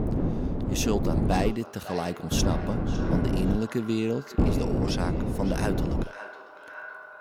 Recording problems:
echo of what is said; noticeable; throughout; 550 ms later, 10 dB below the speech
wind noise on the microphone; heavy; until 1.5 s, from 2.5 to 3.5 s and from 4.5 to 6 s; 2 dB below the speech

